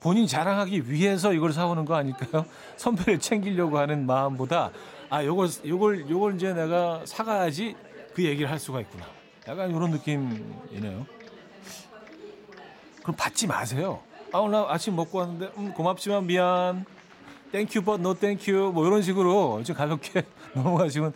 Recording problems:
chatter from many people; faint; throughout; 20 dB below the speech

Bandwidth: 16 kHz